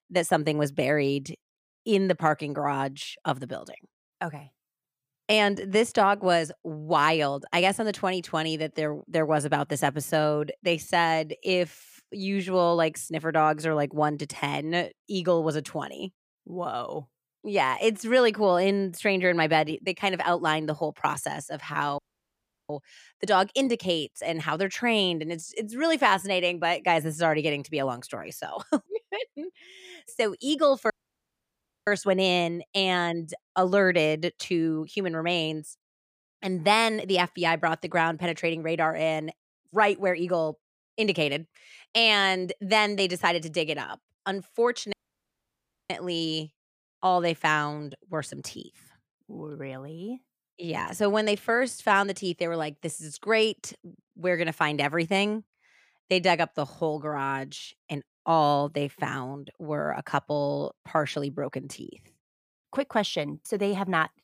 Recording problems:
audio cutting out; at 22 s for 0.5 s, at 31 s for 1 s and at 45 s for 1 s

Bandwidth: 15 kHz